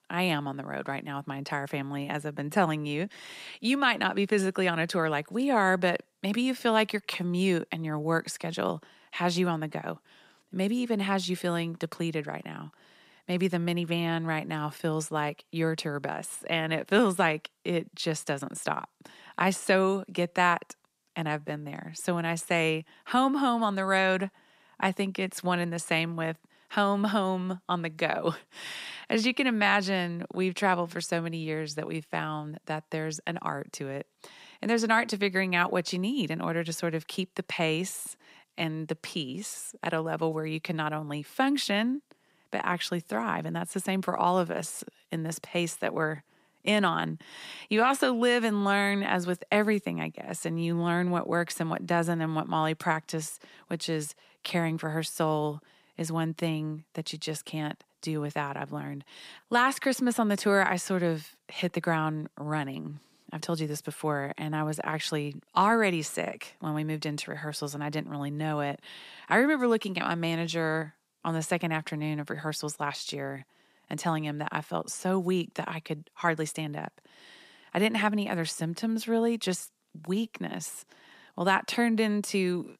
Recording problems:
none

